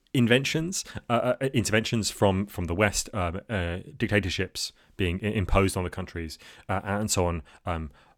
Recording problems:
none

